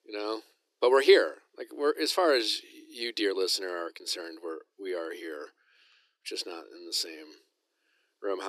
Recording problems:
thin; very; fading below 300 Hz
abrupt cut into speech; at the end

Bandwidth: 14.5 kHz